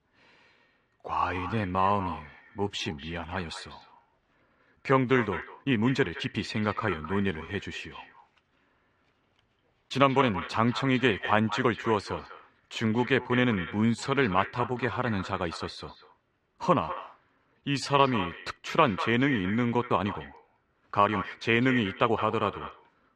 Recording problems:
echo of what is said; strong; throughout; 200 ms later, 10 dB below the speech
muffled; slightly; fading above 3 kHz
uneven, jittery; strongly; from 1 to 22 s

